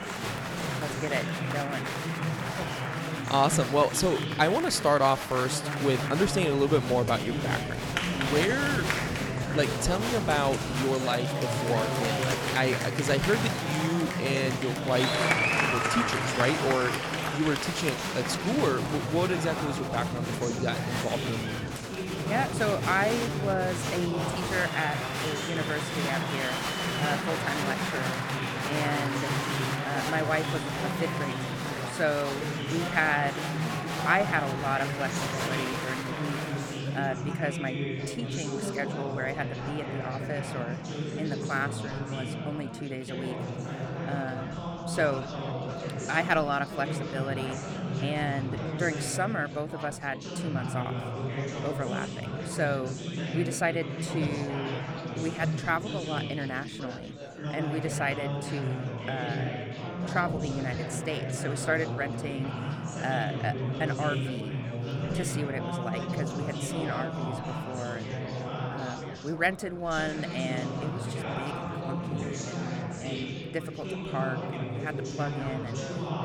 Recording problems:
chatter from many people; loud; throughout; 1 dB below the speech

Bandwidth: 18.5 kHz